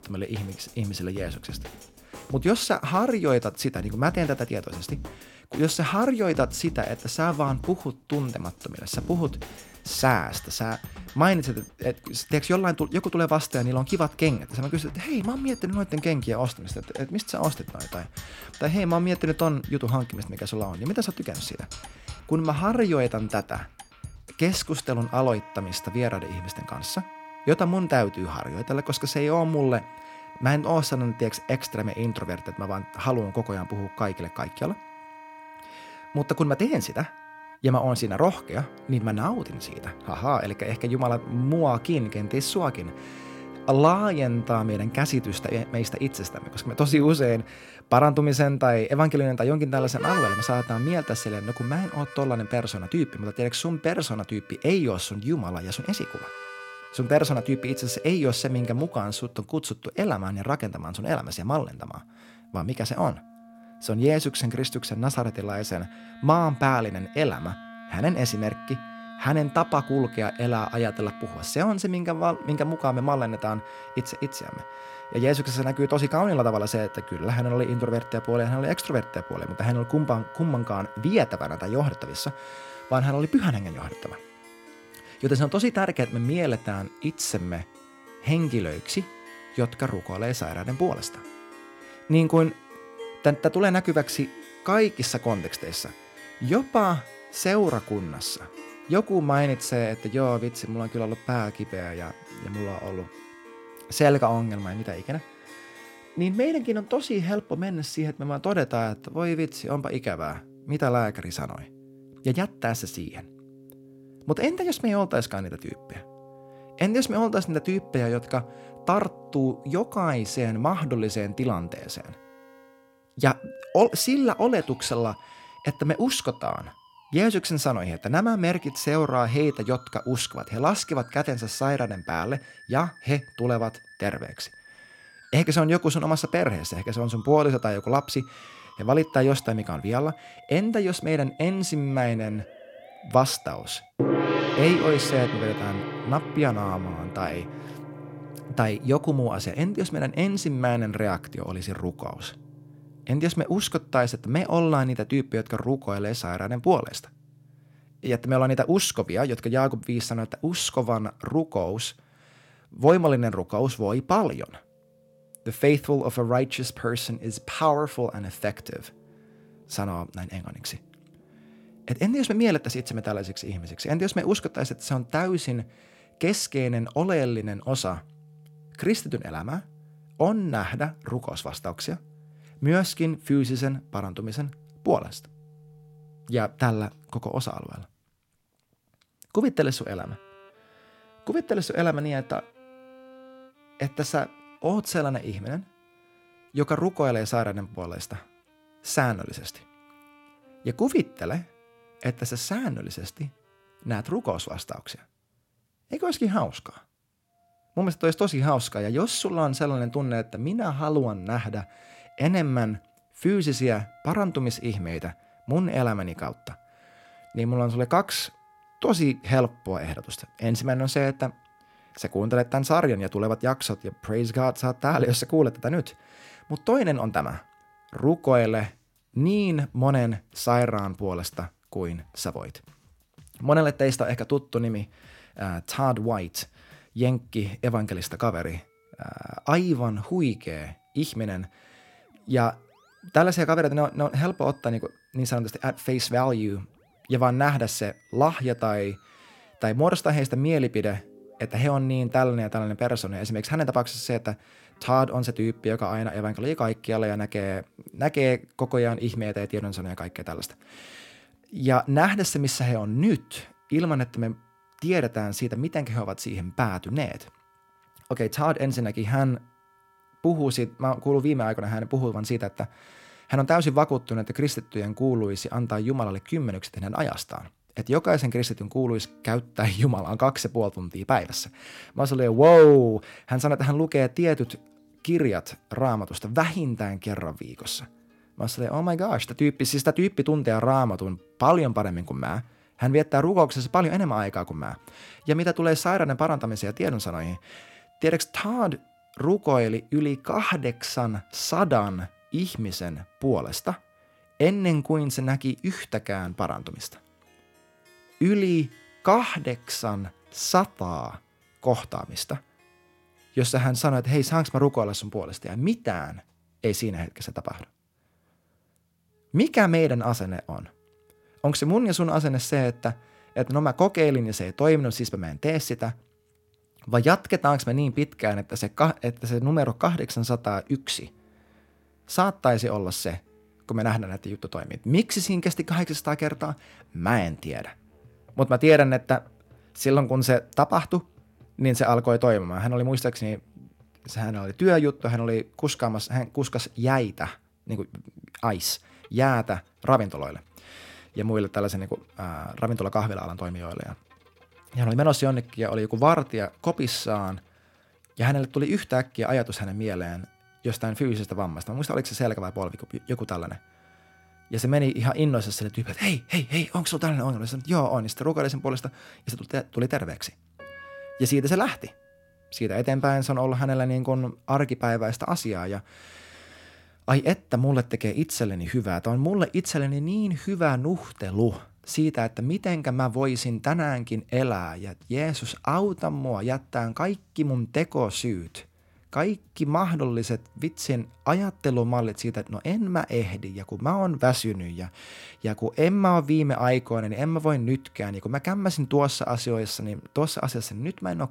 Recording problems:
background music; noticeable; throughout; 15 dB below the speech

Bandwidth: 16.5 kHz